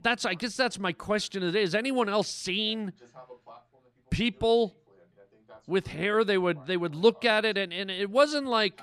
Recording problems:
voice in the background; faint; throughout; 30 dB below the speech

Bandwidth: 14.5 kHz